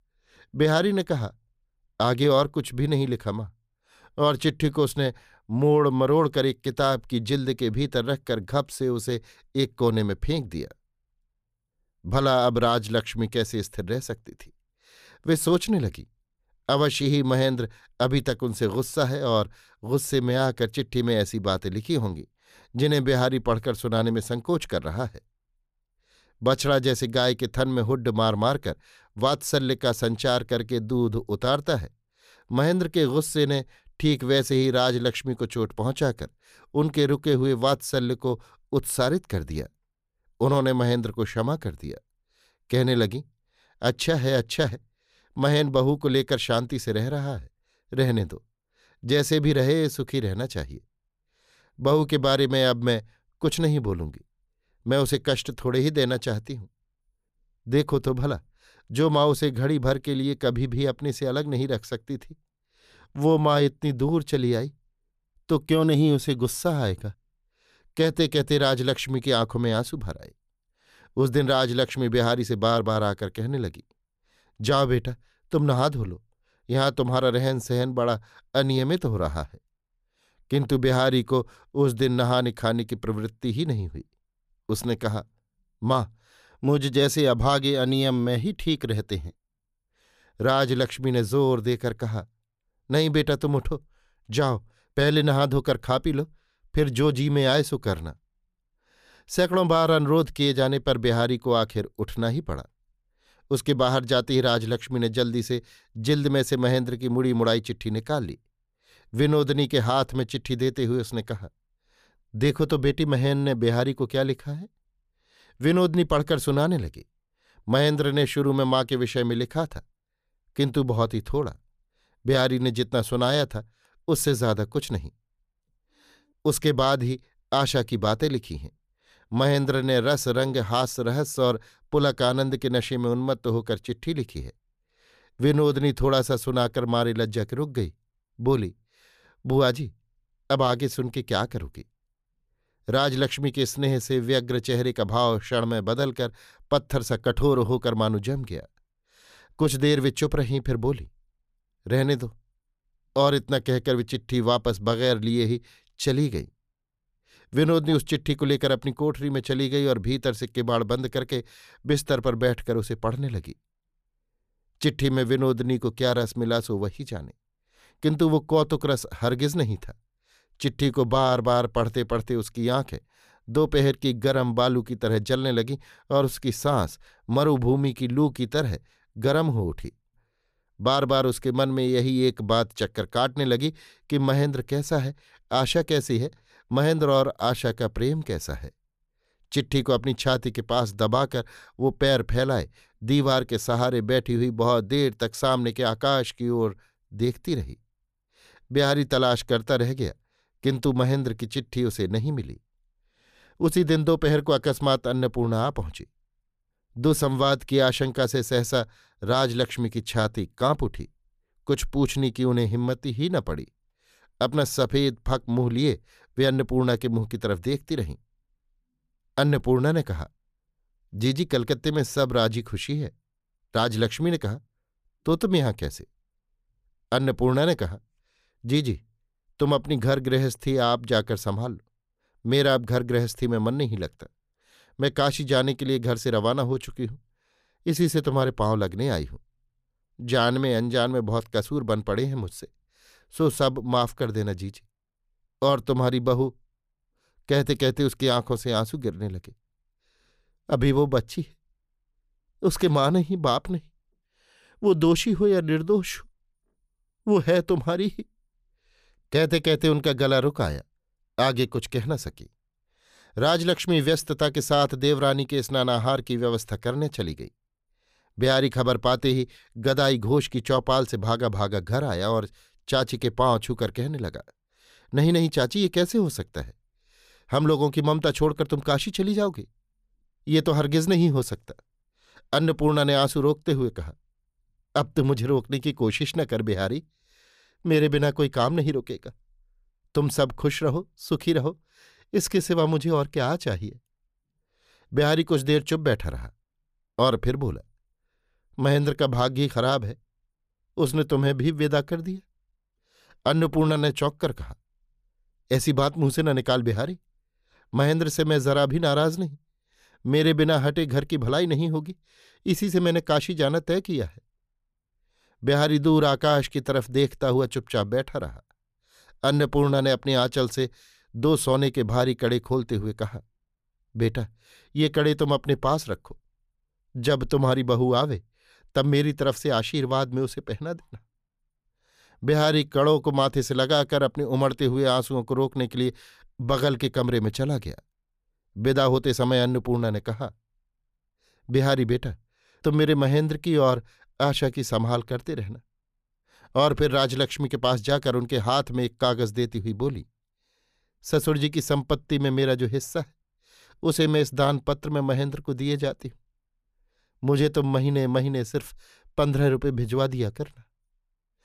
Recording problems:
none

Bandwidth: 14.5 kHz